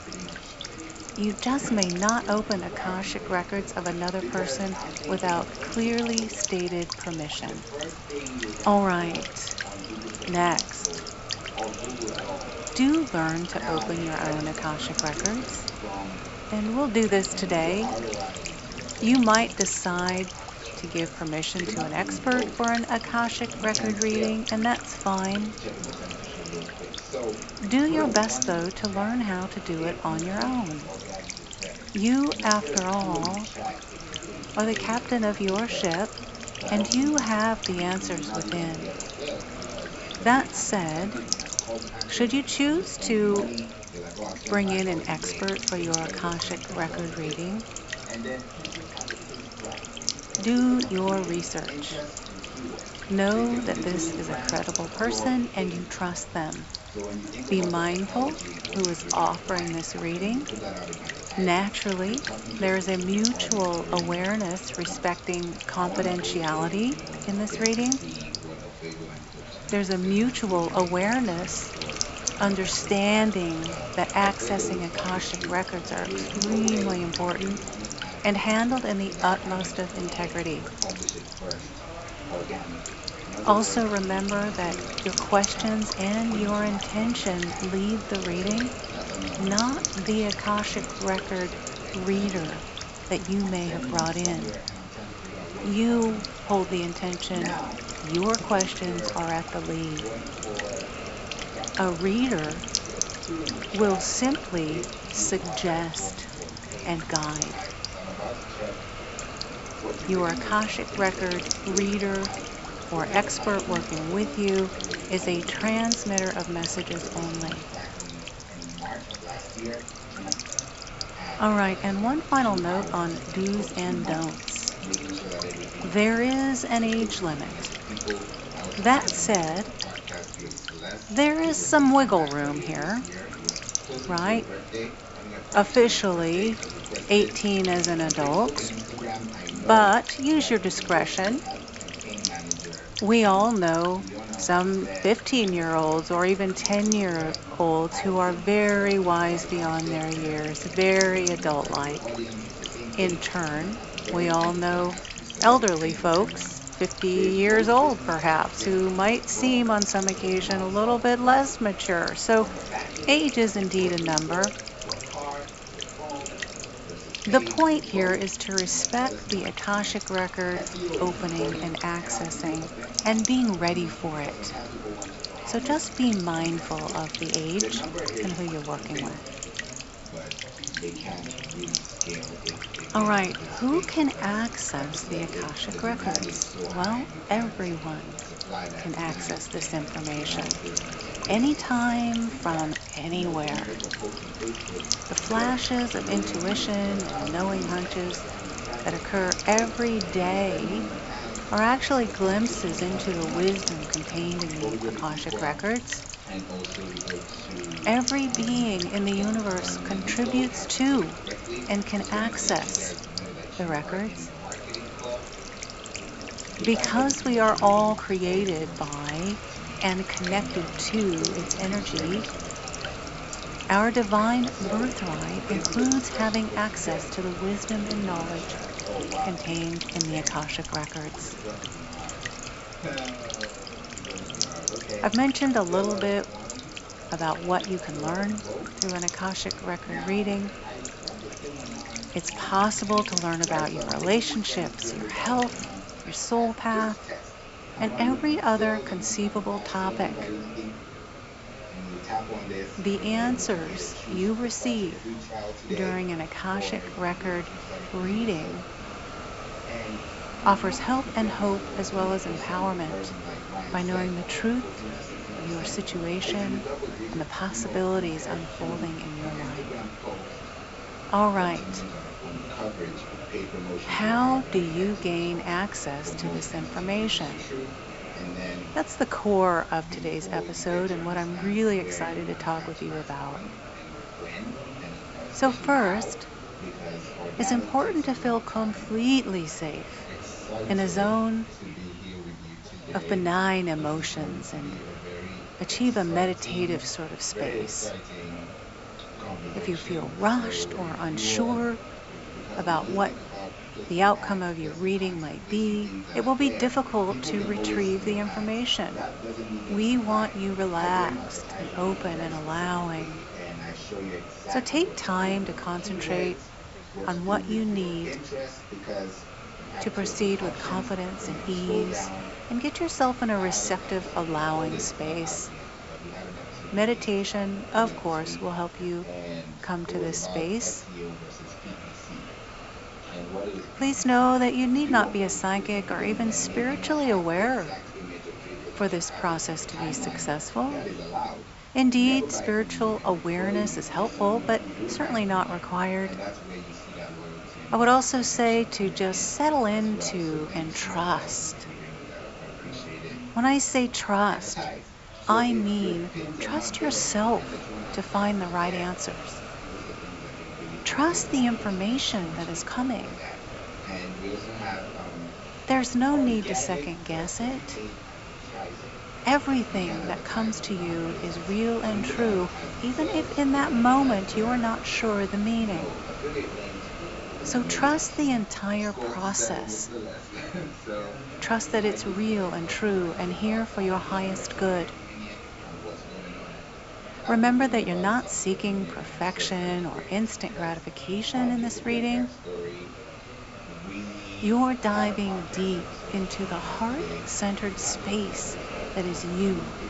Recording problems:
high frequencies cut off; noticeable; nothing above 8 kHz
electrical hum; loud; until 4:06; 50 Hz, 8 dB below the speech
background chatter; noticeable; throughout; 3 voices, 10 dB below the speech
hiss; noticeable; throughout; 15 dB below the speech

